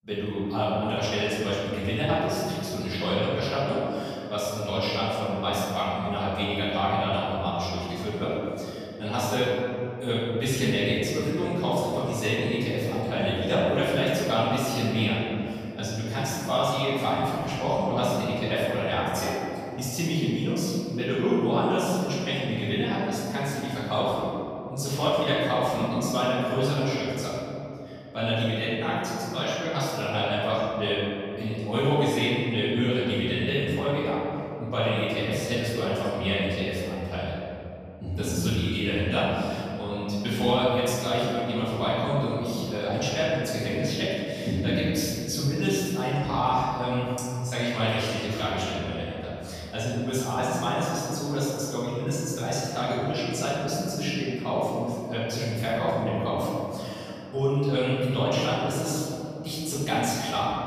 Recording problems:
room echo; strong; dies away in 2.9 s
off-mic speech; far

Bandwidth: 14.5 kHz